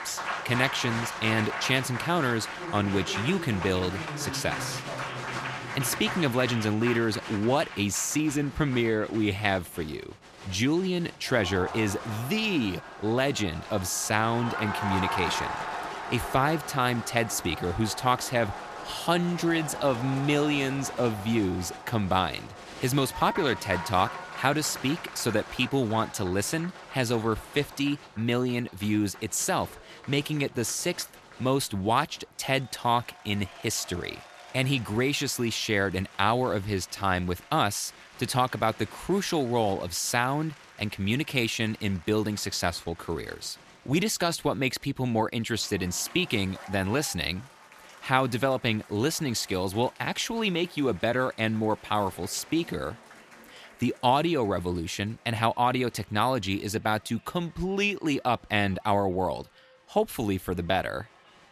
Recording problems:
crowd noise; noticeable; throughout; 10 dB below the speech

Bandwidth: 14.5 kHz